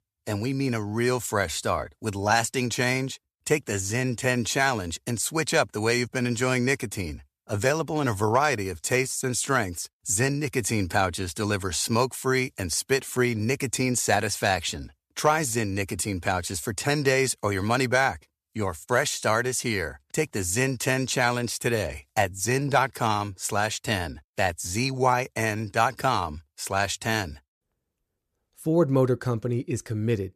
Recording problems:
none

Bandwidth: 14.5 kHz